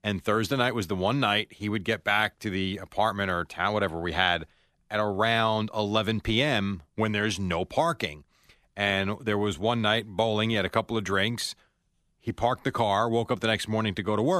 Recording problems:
abrupt cut into speech; at the end

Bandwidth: 14.5 kHz